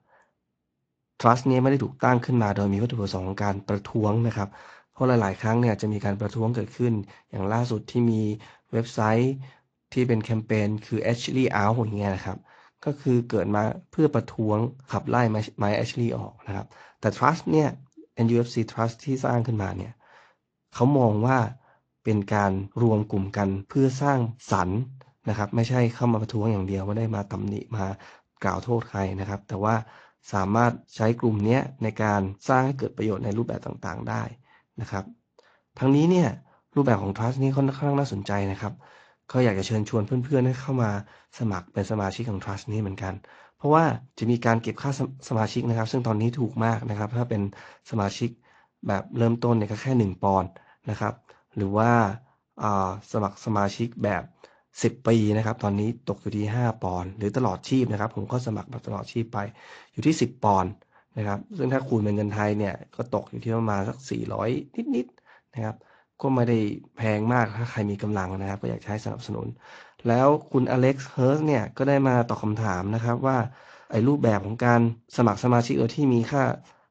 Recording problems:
garbled, watery; slightly; nothing above 7.5 kHz

